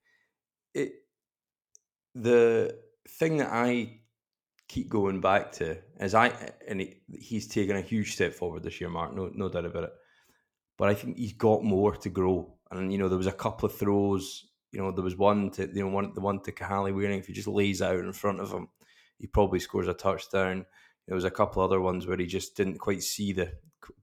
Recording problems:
none

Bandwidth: 18 kHz